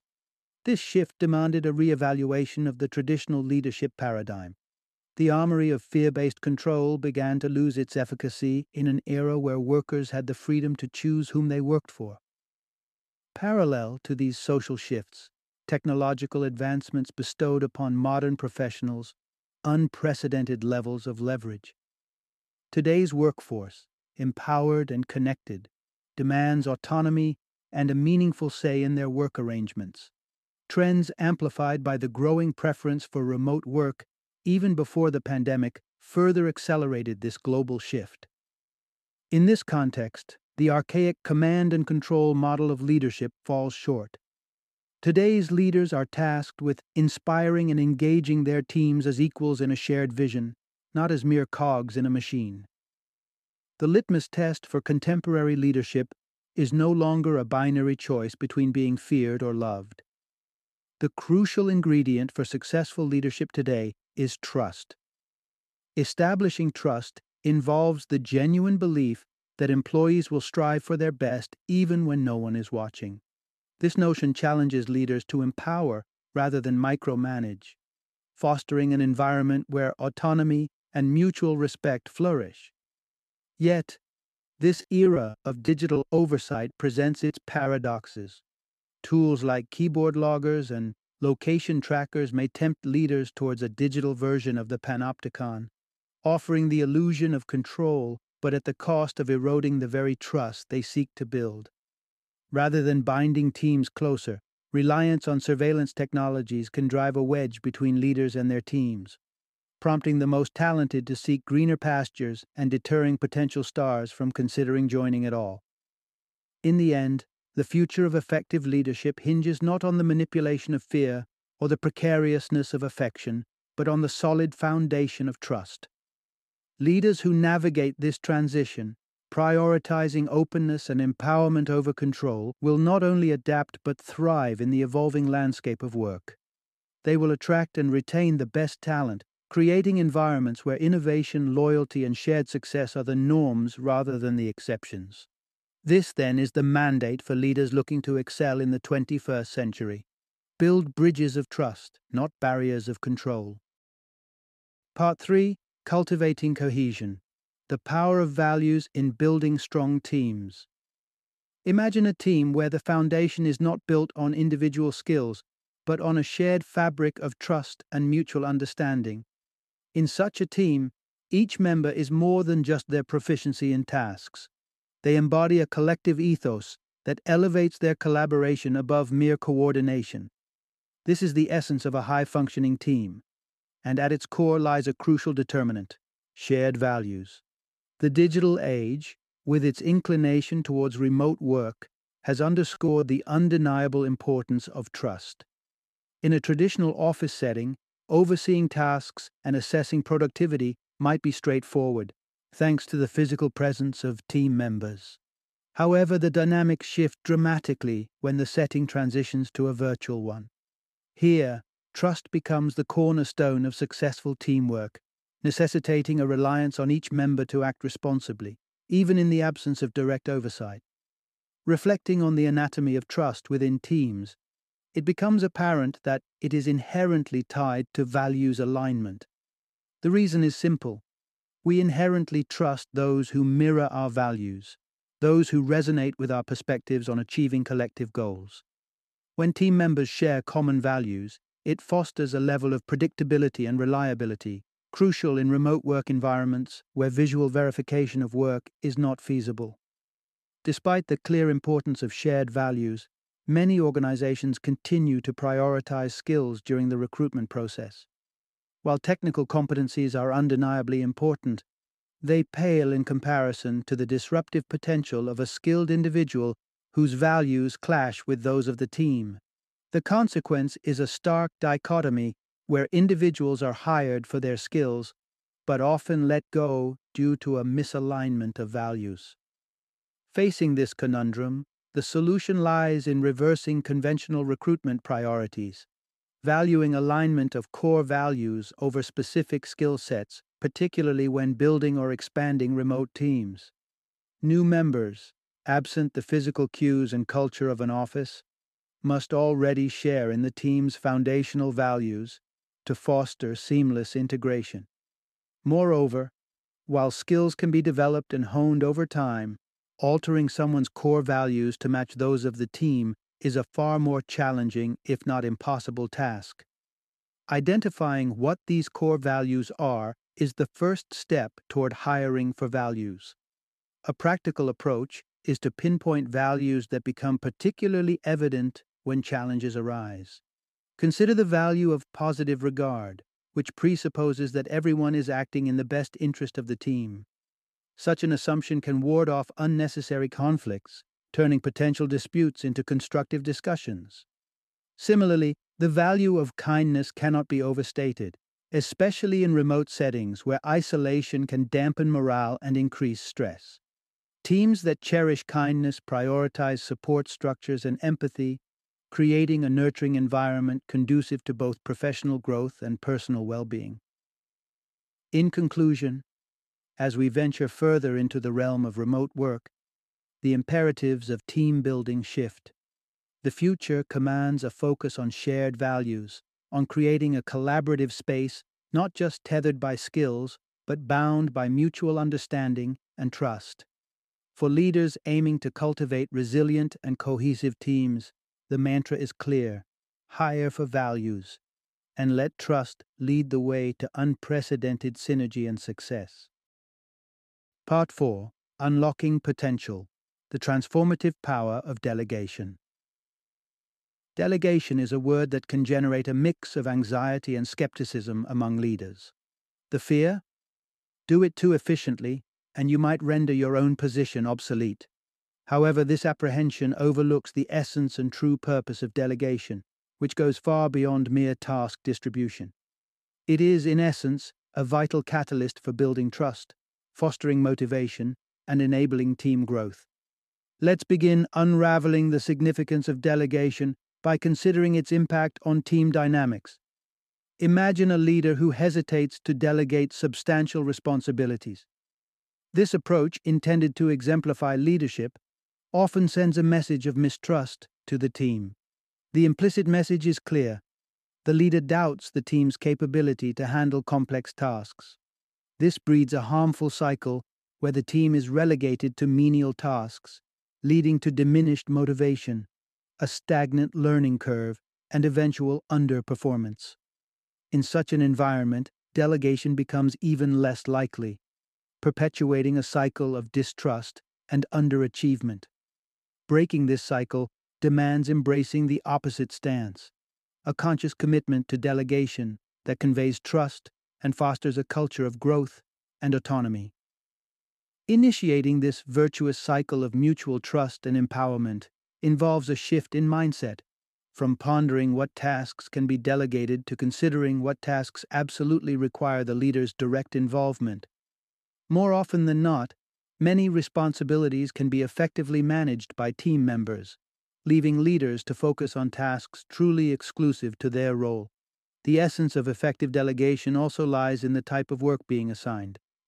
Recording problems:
choppy; very; from 1:25 to 1:28; 9% of the speech affected

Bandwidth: 13.5 kHz